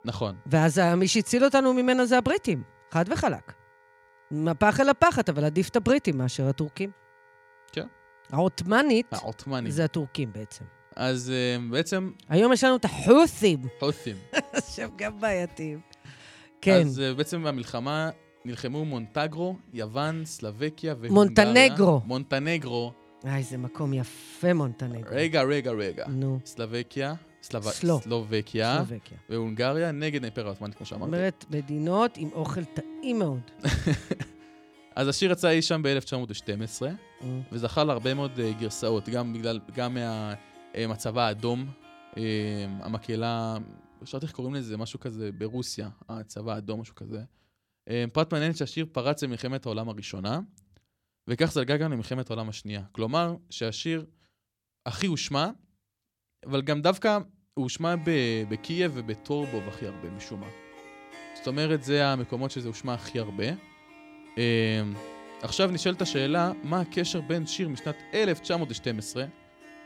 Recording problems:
background music; faint; throughout; 25 dB below the speech

